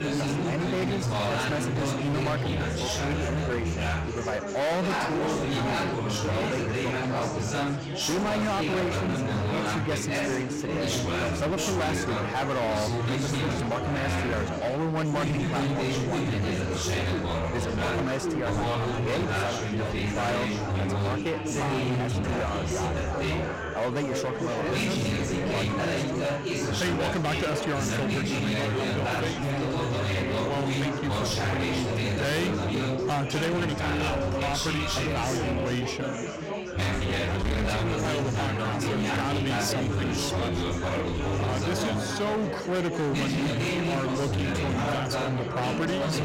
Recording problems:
distortion; heavy; 30% of the sound clipped
chatter from many people; very loud; throughout; 2 dB above the speech
crowd noise; noticeable; throughout; 15 dB below the speech

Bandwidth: 16 kHz